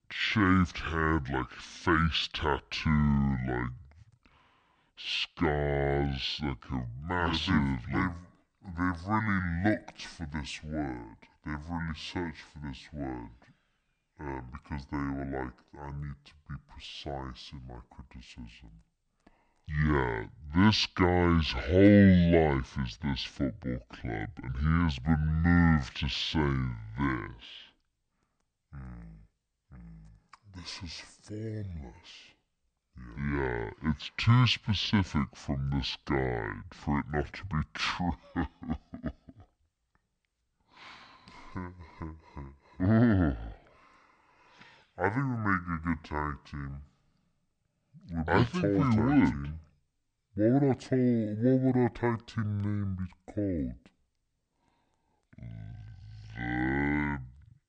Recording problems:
wrong speed and pitch; too slow and too low; 0.6 times normal speed

